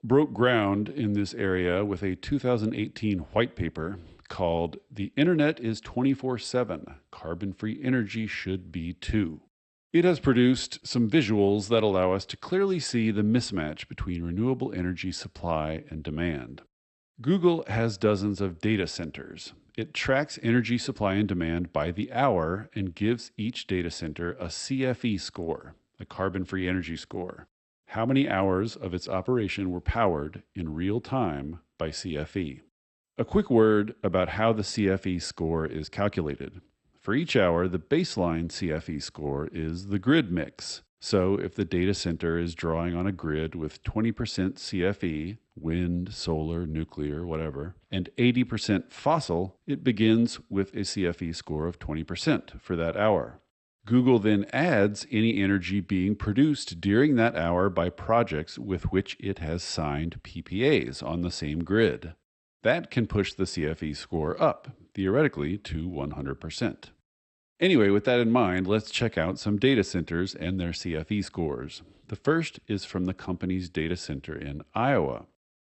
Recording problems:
garbled, watery; slightly; nothing above 8 kHz

